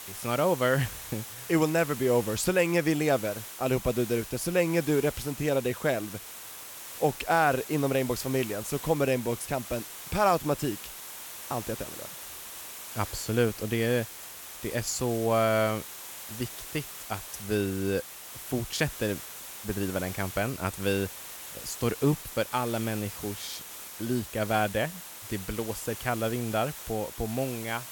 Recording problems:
hiss; noticeable; throughout; 10 dB below the speech

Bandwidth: 17.5 kHz